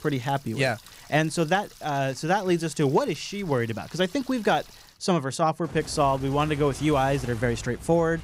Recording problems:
household noises; noticeable; throughout; 20 dB below the speech

